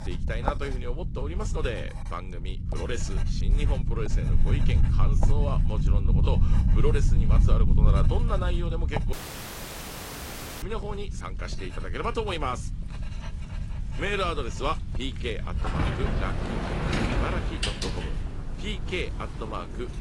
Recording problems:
garbled, watery; slightly; nothing above 10.5 kHz
household noises; loud; throughout; as loud as the speech
low rumble; loud; throughout; 9 dB below the speech
rain or running water; noticeable; throughout; 20 dB below the speech
audio cutting out; at 9 s for 1.5 s

